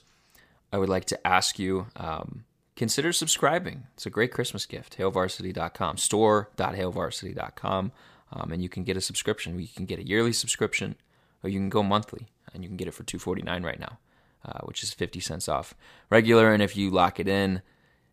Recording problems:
none

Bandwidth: 15 kHz